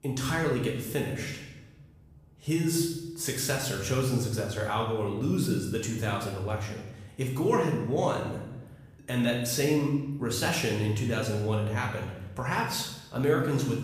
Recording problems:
off-mic speech; far
room echo; noticeable; dies away in 0.8 s

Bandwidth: 15 kHz